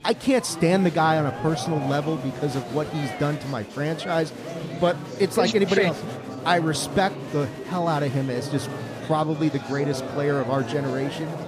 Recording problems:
murmuring crowd; loud; throughout; 9 dB below the speech

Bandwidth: 14.5 kHz